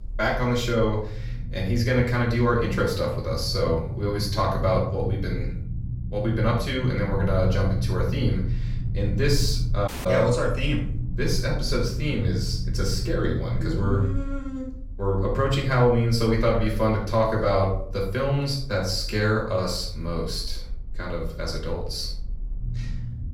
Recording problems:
off-mic speech; far
room echo; noticeable; dies away in 0.5 s
low rumble; noticeable; throughout; 15 dB below the speech
audio cutting out; at 10 s

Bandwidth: 16 kHz